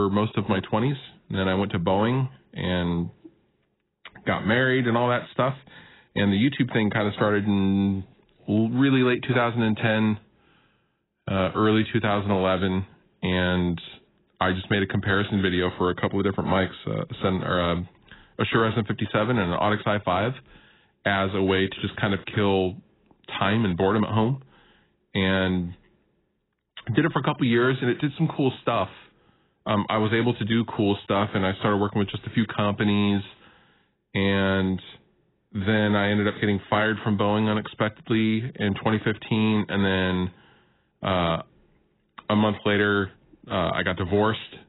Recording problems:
garbled, watery; badly; nothing above 4 kHz
abrupt cut into speech; at the start

